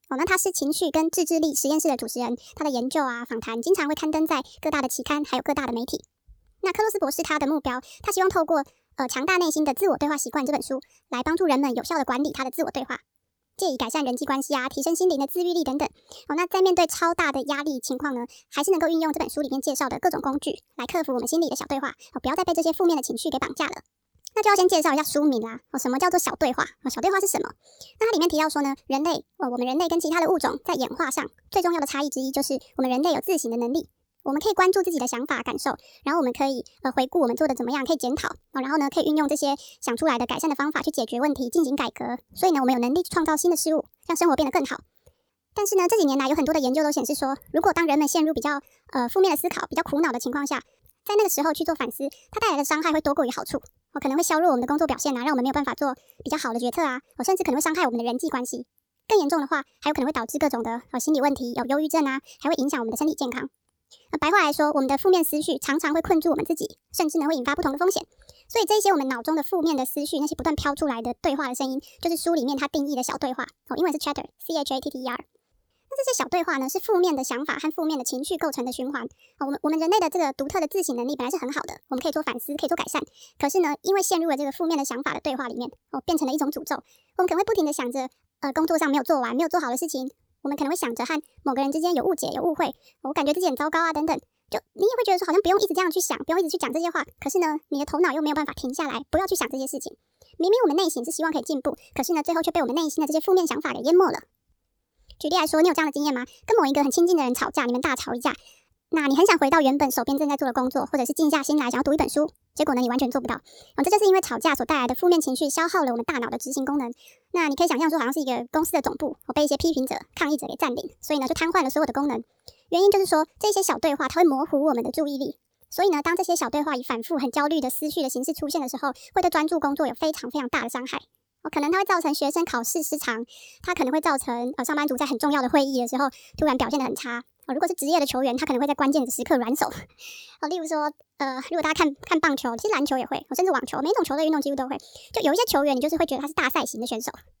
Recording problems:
wrong speed and pitch; too fast and too high; 1.5 times normal speed

